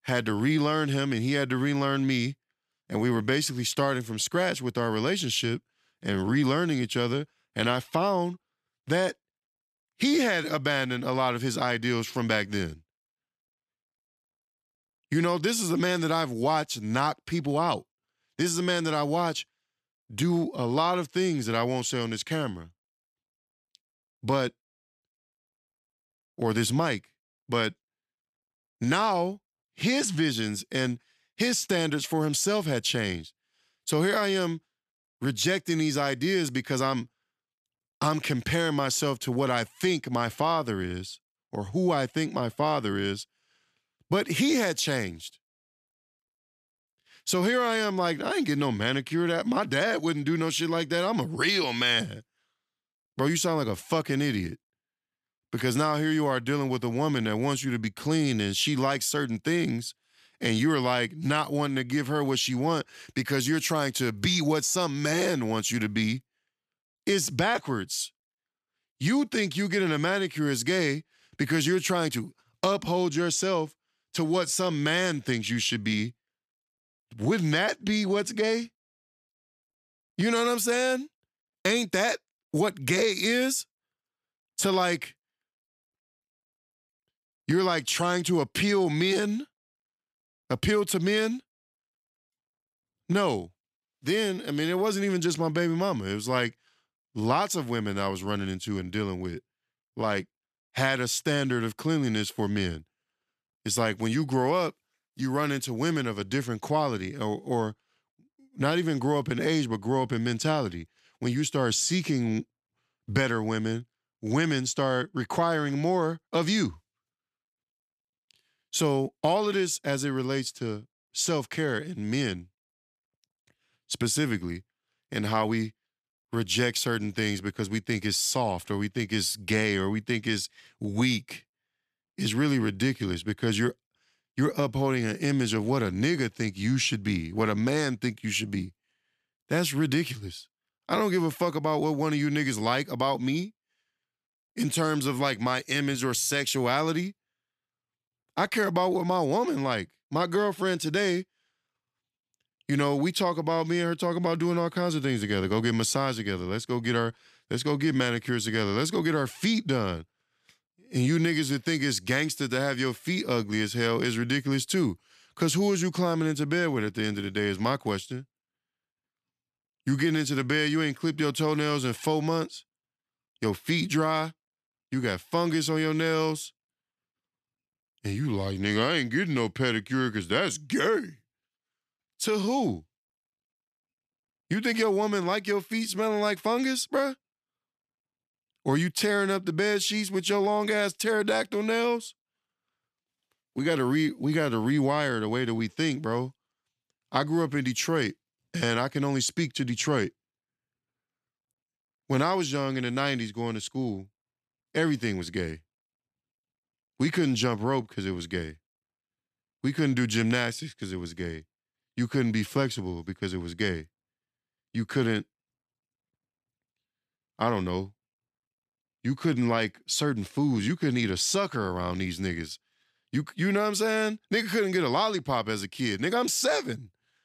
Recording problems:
none

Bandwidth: 14.5 kHz